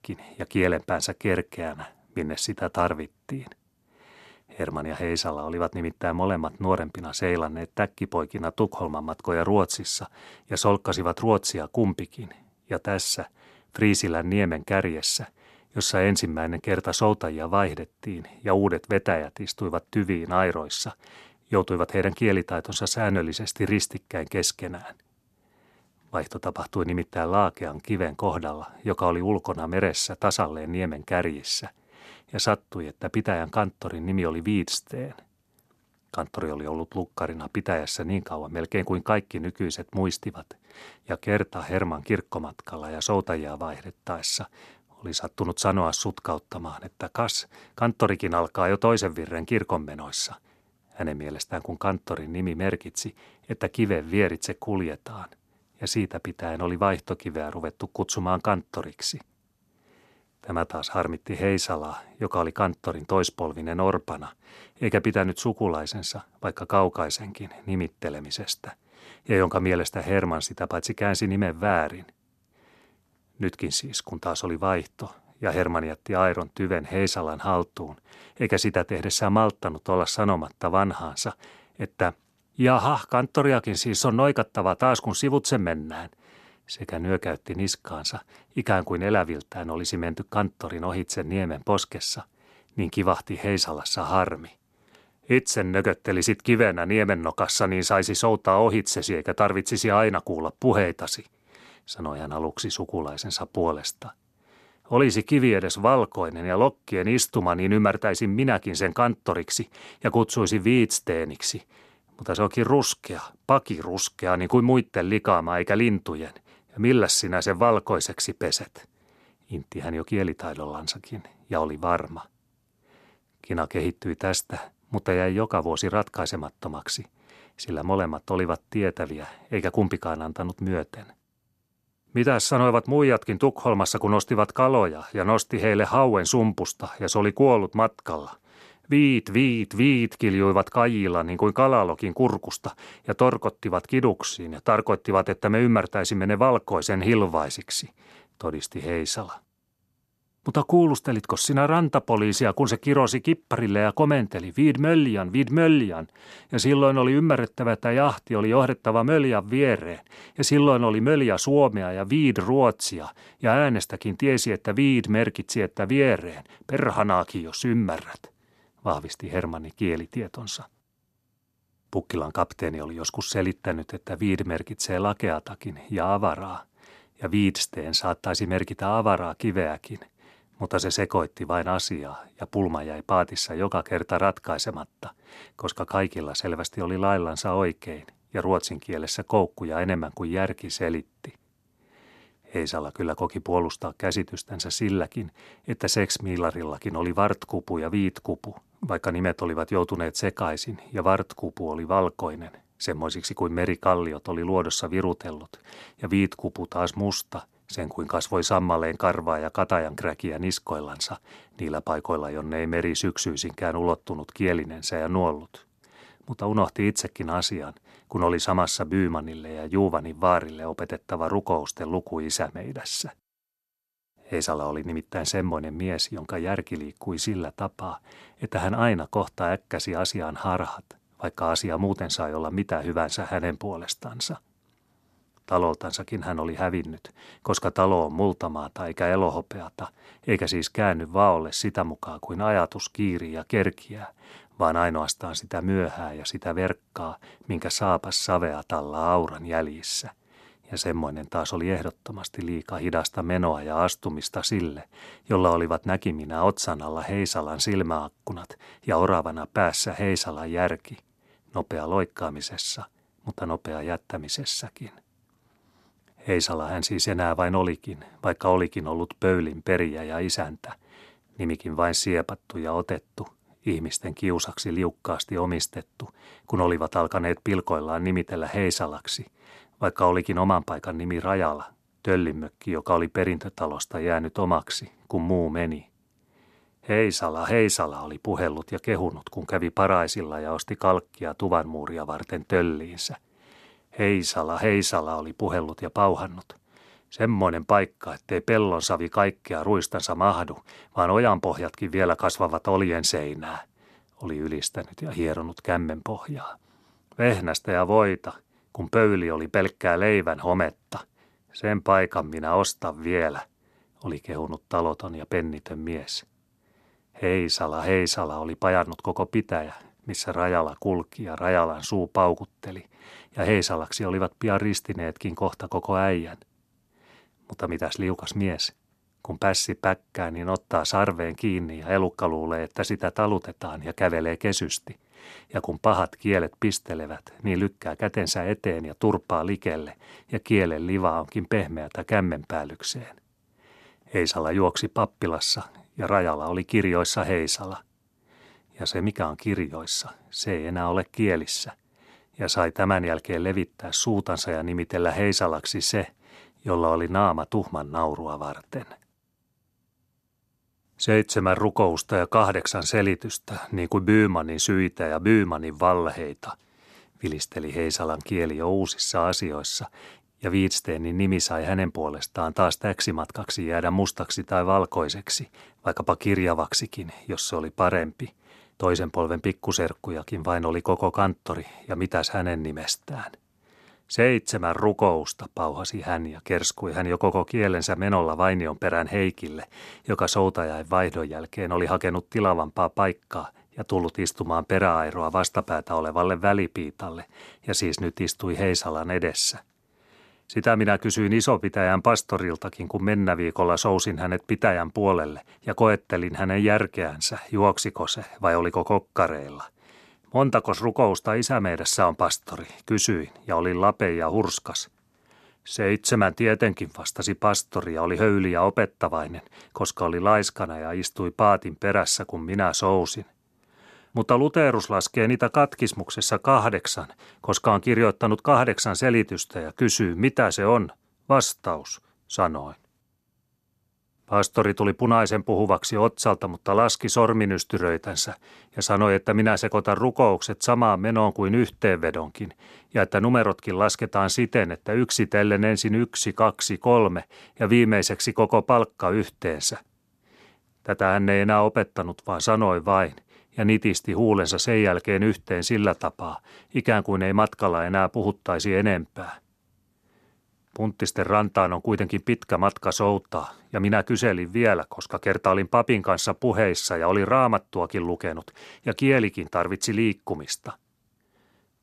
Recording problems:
none

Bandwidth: 13.5 kHz